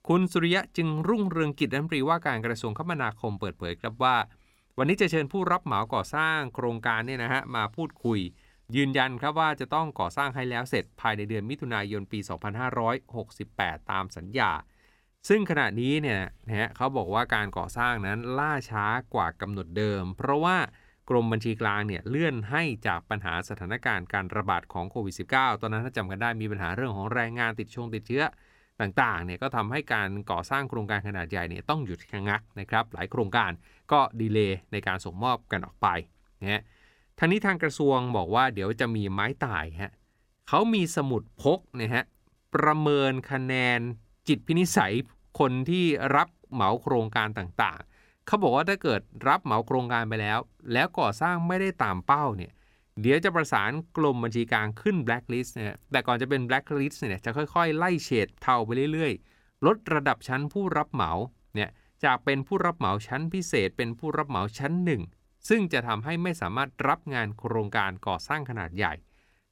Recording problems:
none

